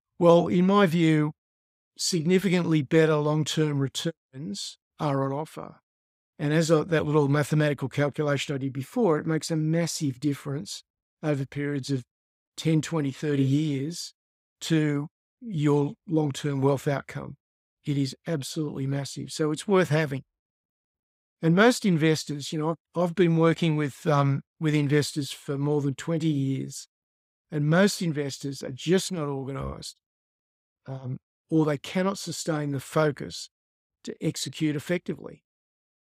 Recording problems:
none

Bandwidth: 15.5 kHz